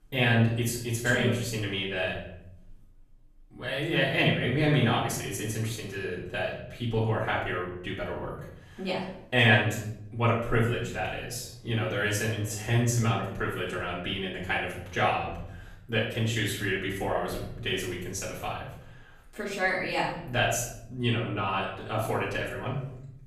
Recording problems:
off-mic speech; far
room echo; noticeable; dies away in 0.8 s

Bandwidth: 14.5 kHz